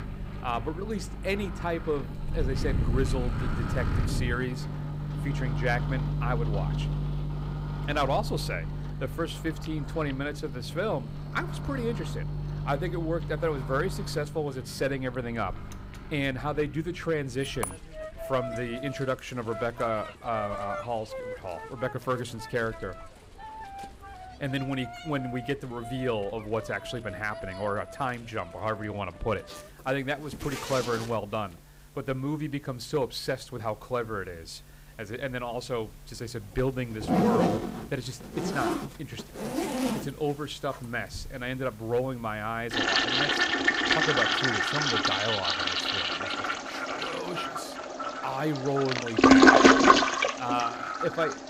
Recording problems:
household noises; very loud; throughout; 5 dB above the speech

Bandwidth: 15.5 kHz